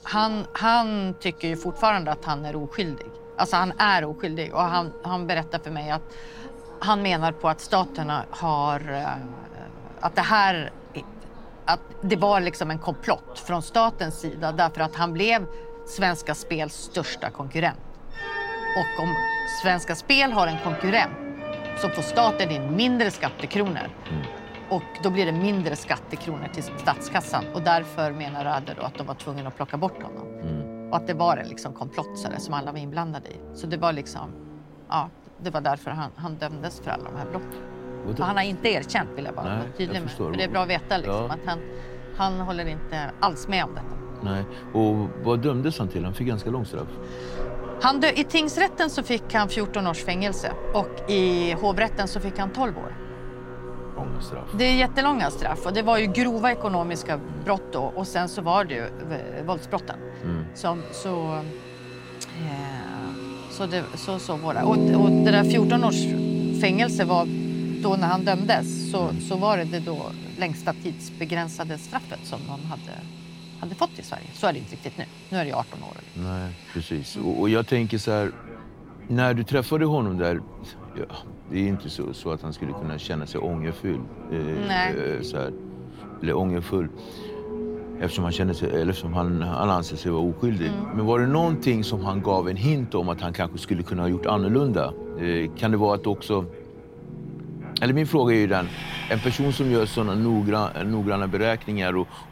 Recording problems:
background music; loud; throughout; 8 dB below the speech
train or aircraft noise; noticeable; throughout; 20 dB below the speech

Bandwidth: 16 kHz